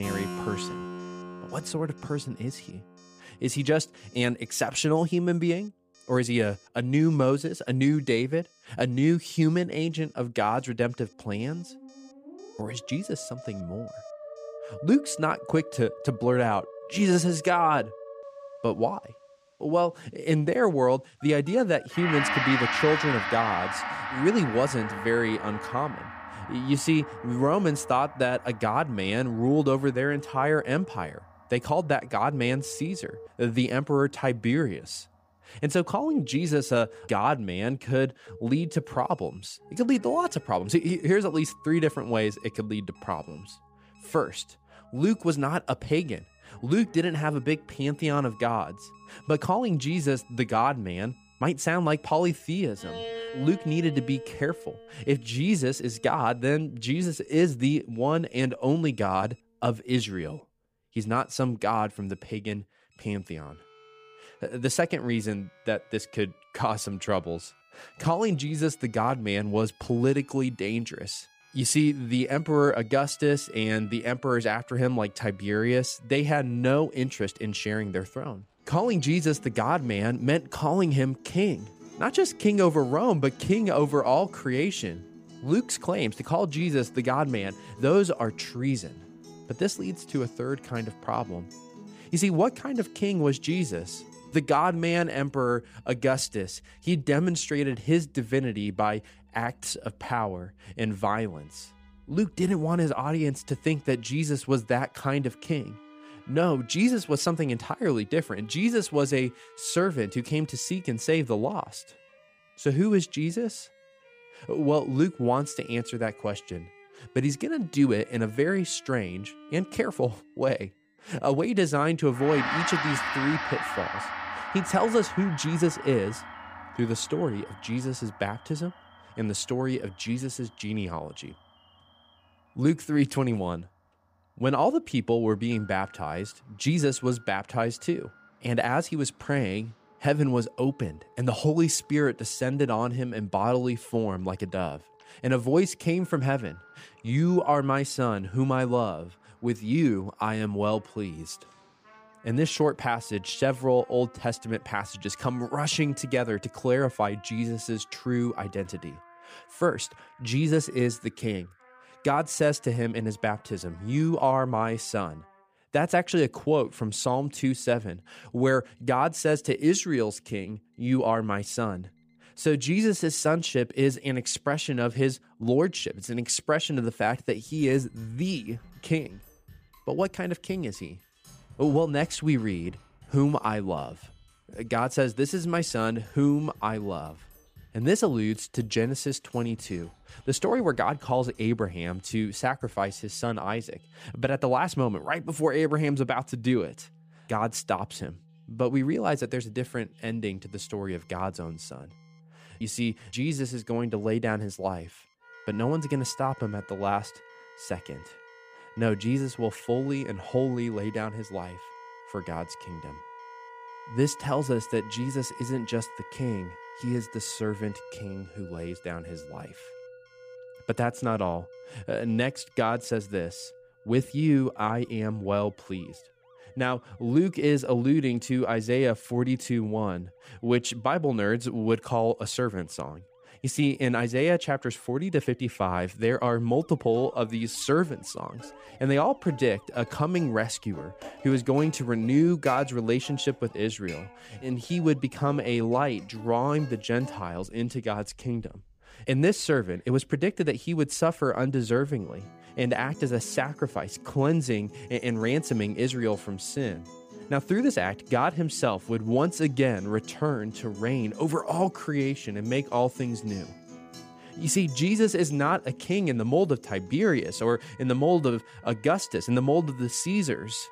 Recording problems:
background music; noticeable; throughout; 15 dB below the speech
alarms or sirens; faint; throughout; 30 dB below the speech
abrupt cut into speech; at the start

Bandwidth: 15 kHz